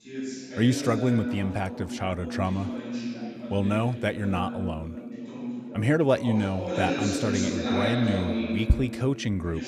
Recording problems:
background chatter; loud; throughout; 3 voices, 5 dB below the speech

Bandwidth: 14.5 kHz